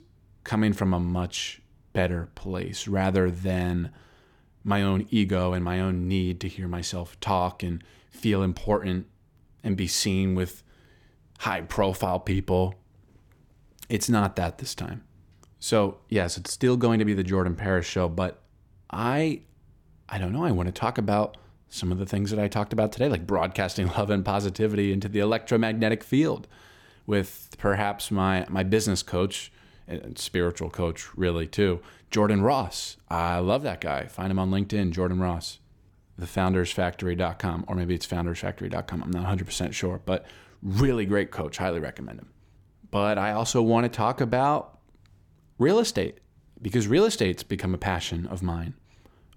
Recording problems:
none

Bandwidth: 17.5 kHz